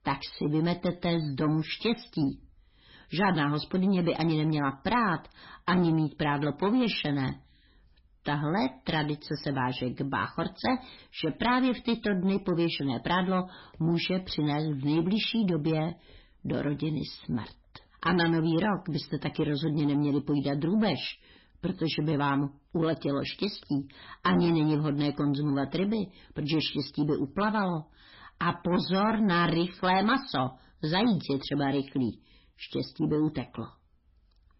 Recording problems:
garbled, watery; badly; nothing above 5.5 kHz
distortion; slight; 10 dB below the speech

